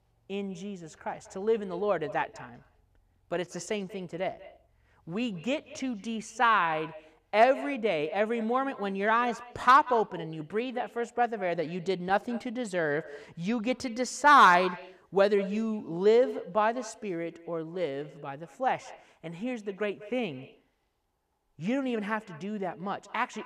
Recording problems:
echo of what is said; noticeable; throughout; 190 ms later, 20 dB below the speech

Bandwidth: 14.5 kHz